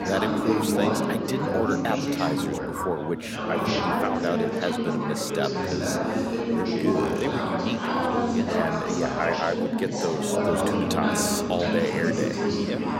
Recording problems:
chatter from many people; very loud; throughout; 3 dB above the speech

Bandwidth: 16 kHz